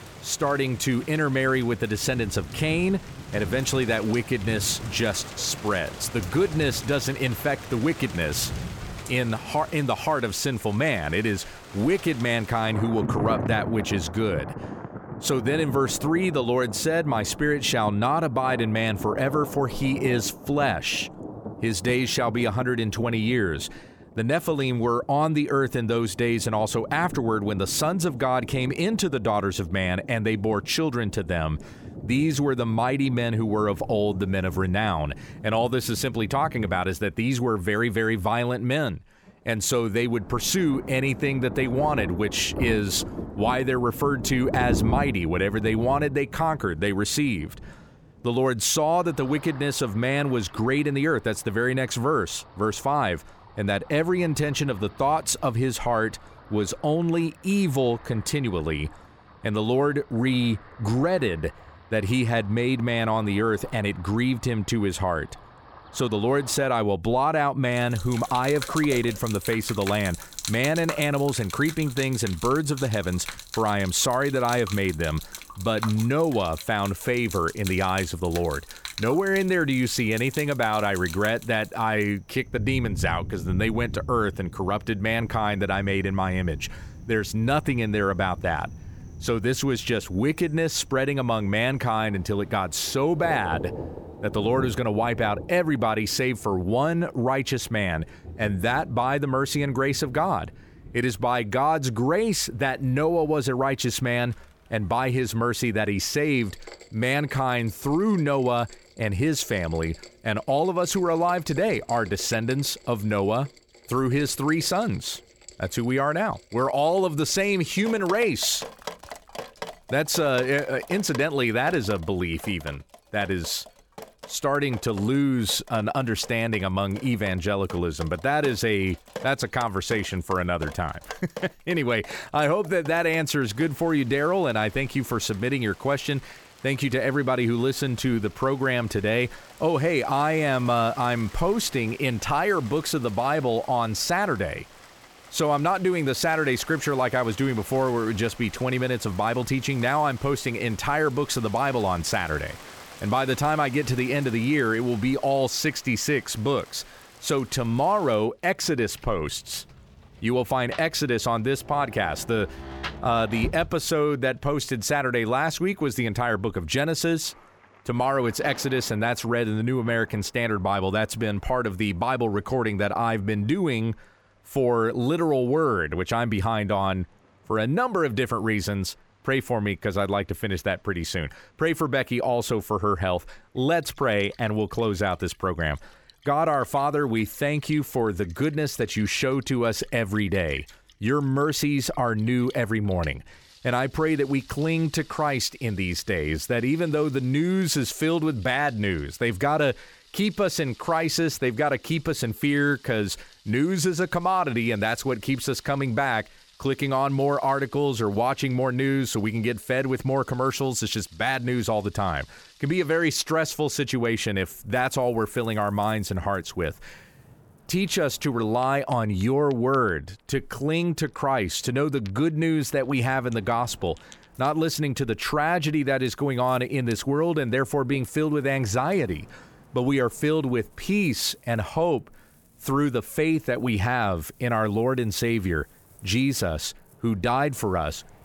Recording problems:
rain or running water; noticeable; throughout; 15 dB below the speech

